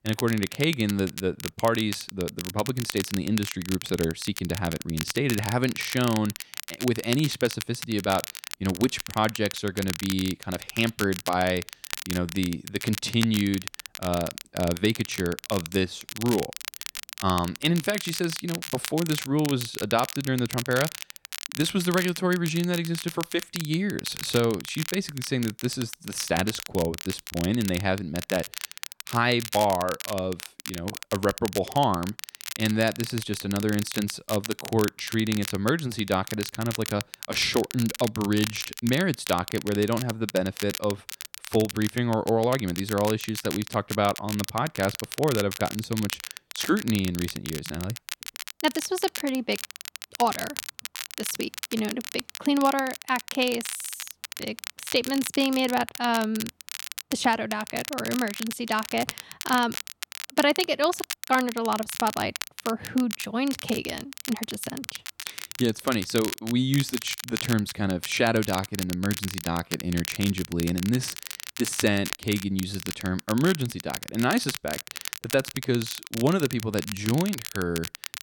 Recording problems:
crackle, like an old record; loud; 8 dB below the speech

